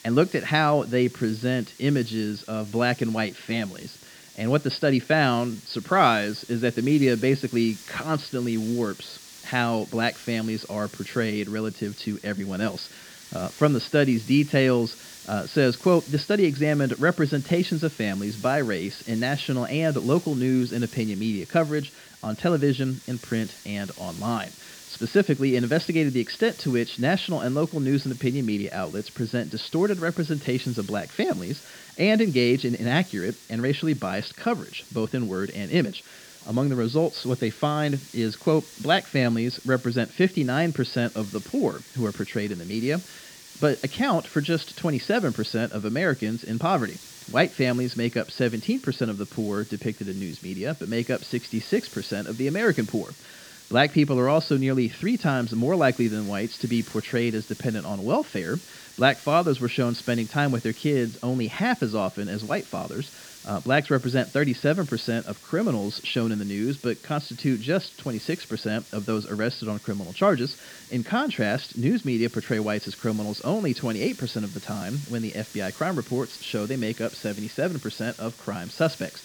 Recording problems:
high frequencies cut off; noticeable; nothing above 5 kHz
hiss; noticeable; throughout; 20 dB below the speech

